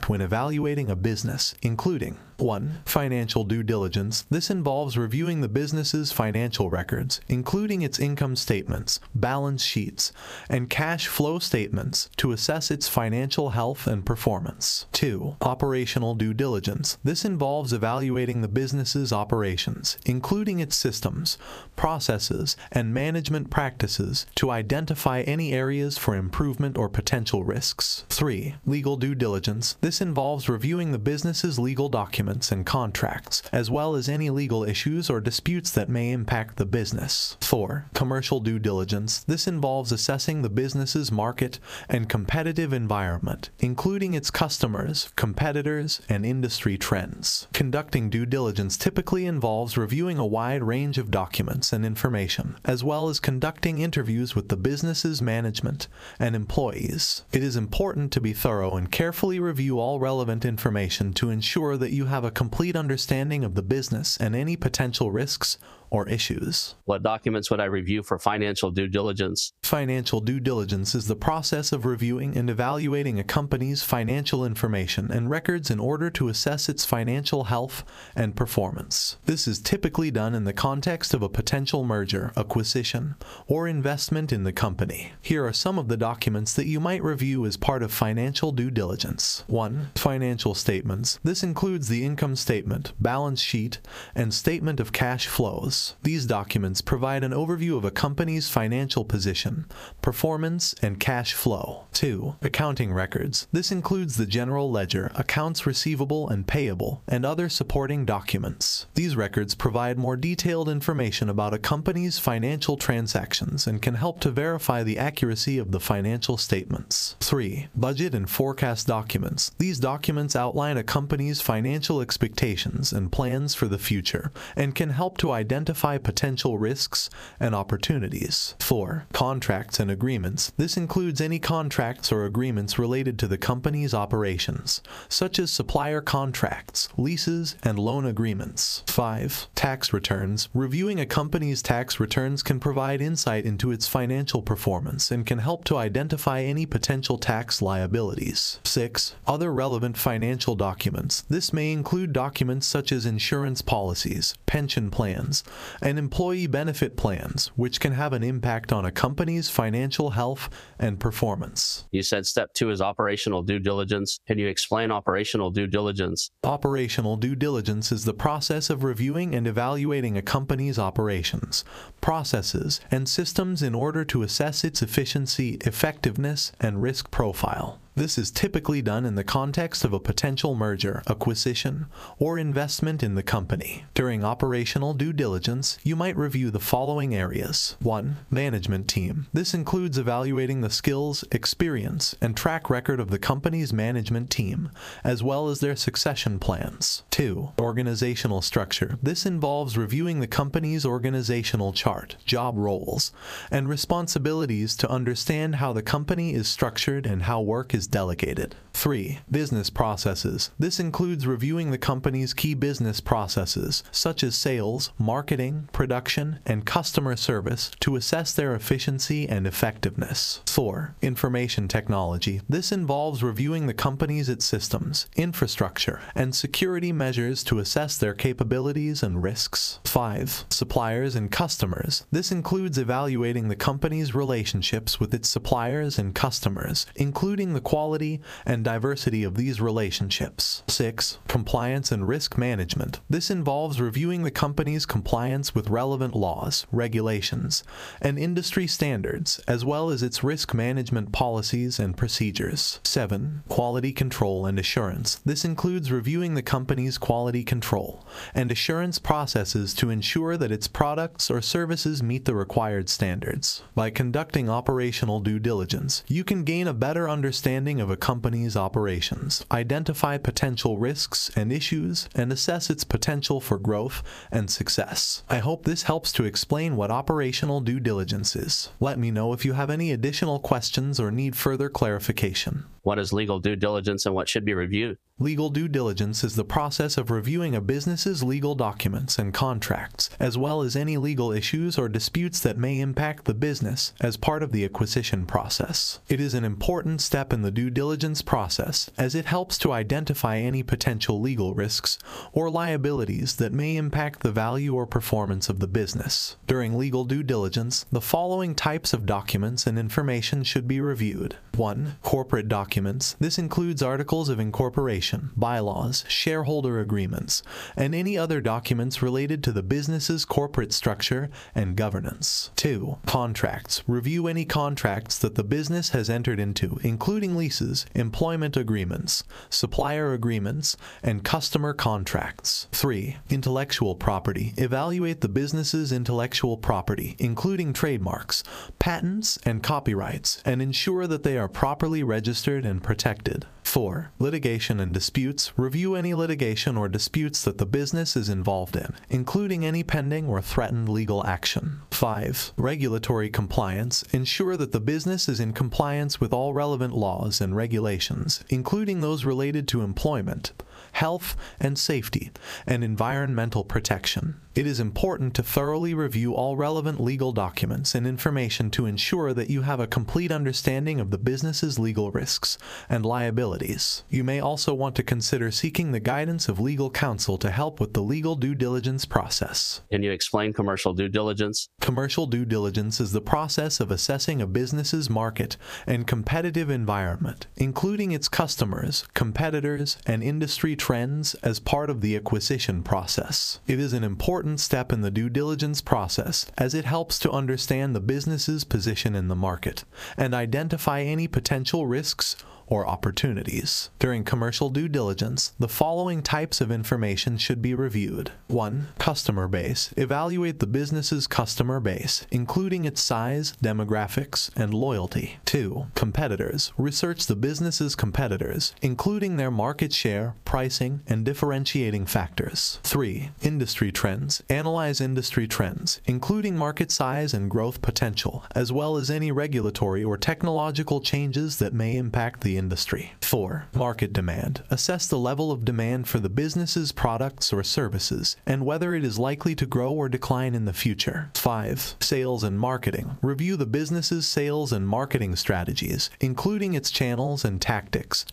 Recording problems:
squashed, flat; heavily

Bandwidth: 15 kHz